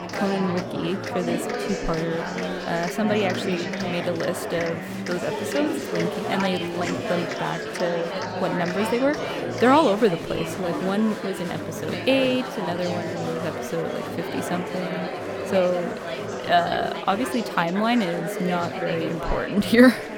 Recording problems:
chatter from many people; loud; throughout; 4 dB below the speech

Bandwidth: 17.5 kHz